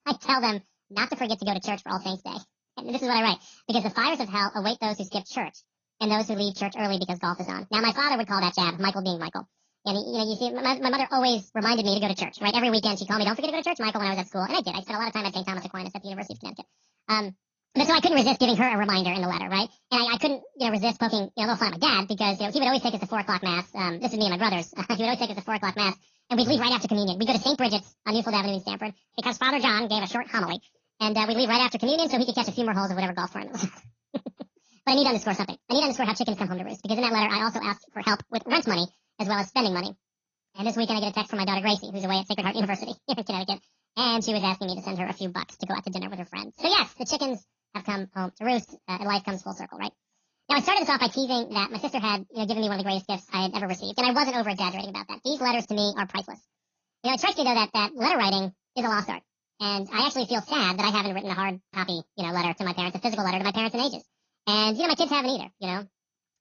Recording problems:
wrong speed and pitch; too fast and too high; 1.6 times normal speed
garbled, watery; slightly; nothing above 5.5 kHz

